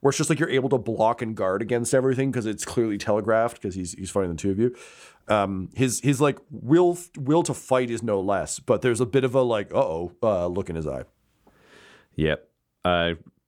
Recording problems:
none

